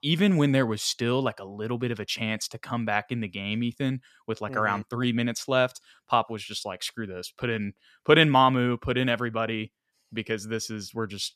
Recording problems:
none

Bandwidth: 14 kHz